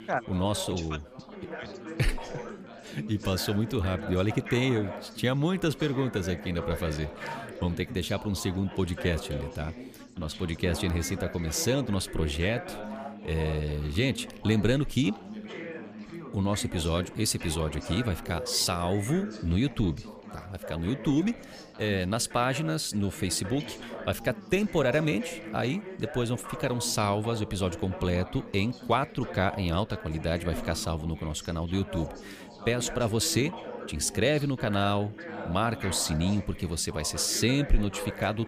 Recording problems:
background chatter; noticeable; throughout; 4 voices, 10 dB below the speech

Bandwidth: 15 kHz